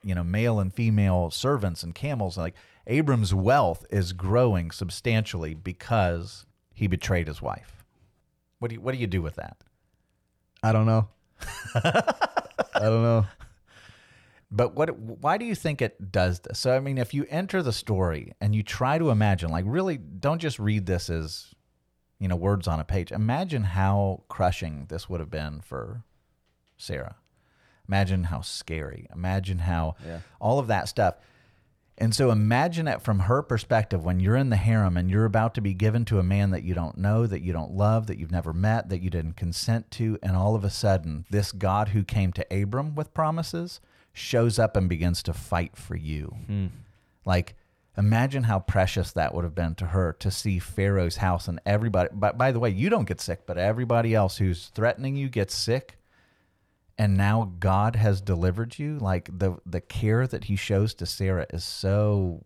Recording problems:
none

